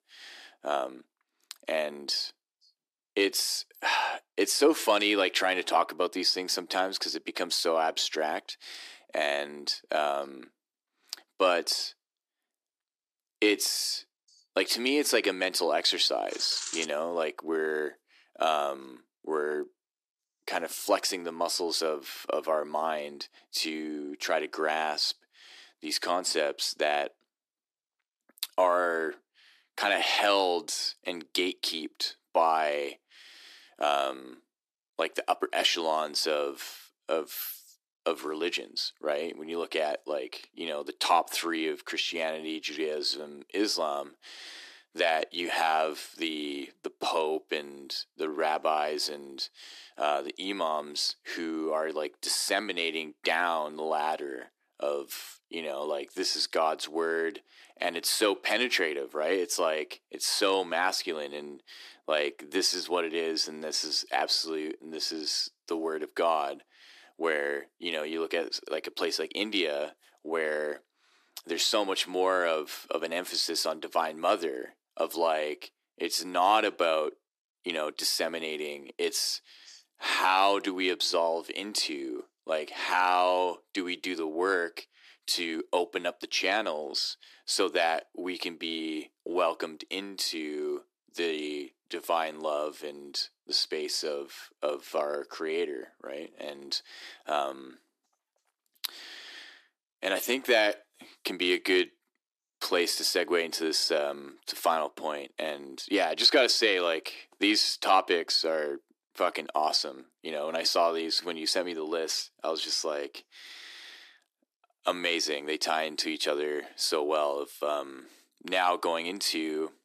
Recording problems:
thin; very; fading below 300 Hz

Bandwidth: 14.5 kHz